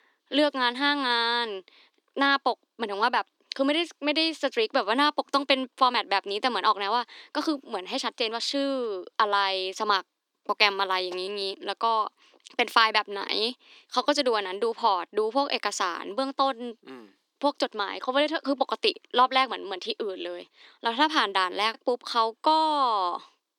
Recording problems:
thin; very slightly; fading below 300 Hz

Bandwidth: 18.5 kHz